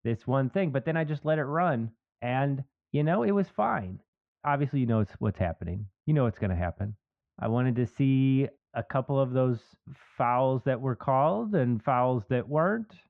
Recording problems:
muffled; very; fading above 1 kHz

